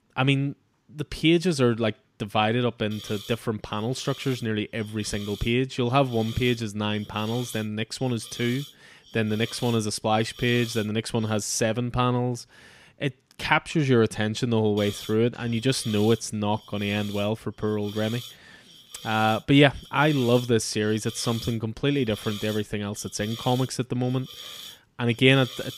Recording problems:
hiss; noticeable; from 3 to 11 s and from 15 s on; 15 dB below the speech

